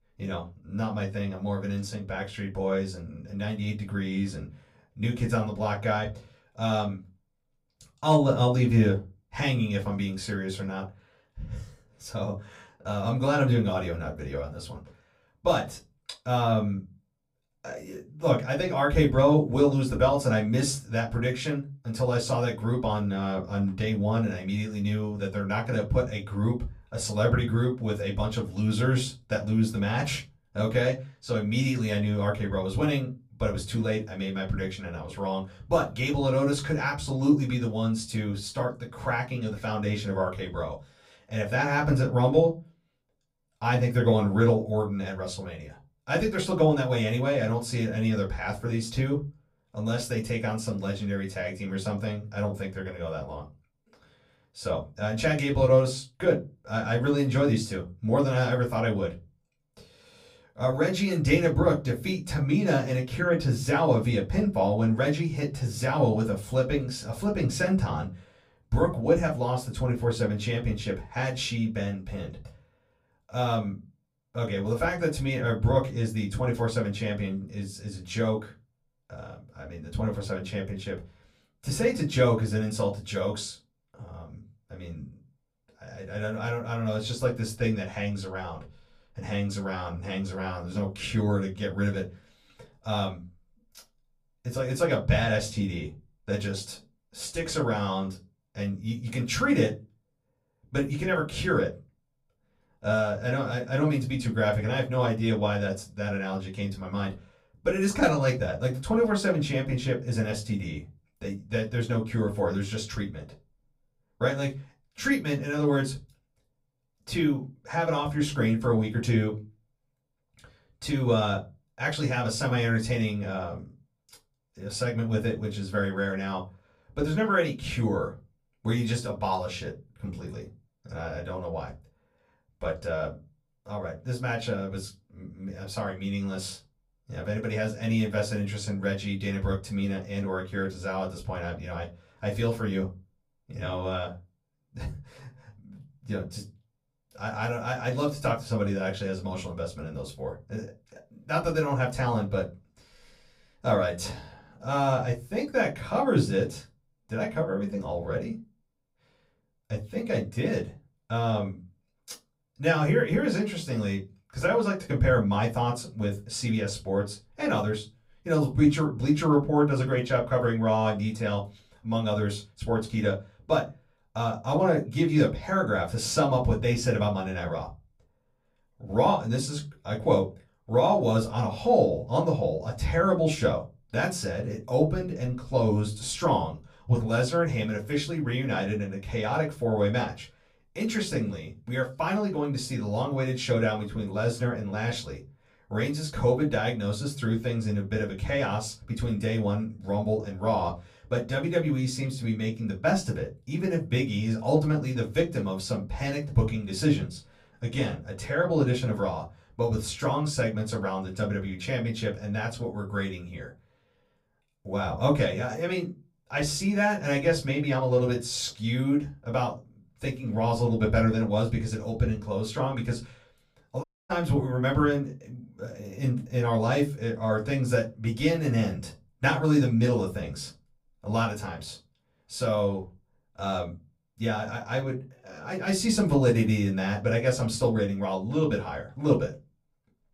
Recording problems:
off-mic speech; far
room echo; very slight; dies away in 0.2 s
audio cutting out; at 3:44

